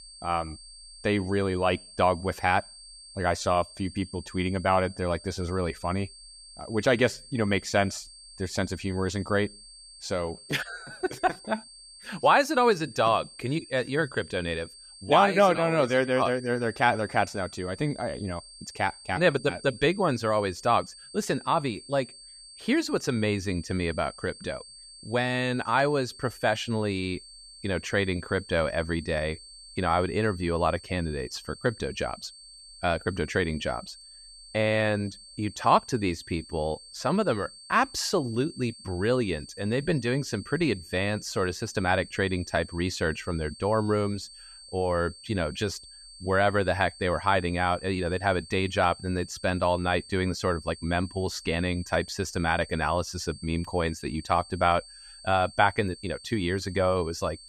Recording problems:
high-pitched whine; noticeable; throughout; 4.5 kHz, 20 dB below the speech

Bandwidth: 14.5 kHz